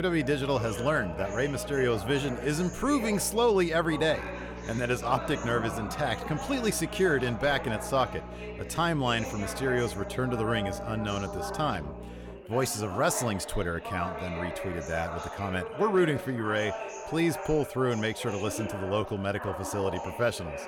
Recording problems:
background chatter; loud; throughout; 3 voices, 9 dB below the speech
electrical hum; faint; until 12 s; 60 Hz, 20 dB below the speech
abrupt cut into speech; at the start

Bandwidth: 17 kHz